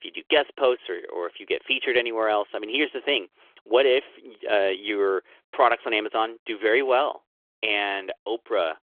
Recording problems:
phone-call audio; nothing above 3.5 kHz

